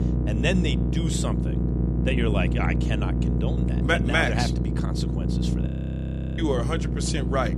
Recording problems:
electrical hum; loud; throughout; 60 Hz, 8 dB below the speech
low rumble; loud; throughout; 10 dB below the speech
audio freezing; at 5.5 s for 0.5 s

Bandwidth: 14 kHz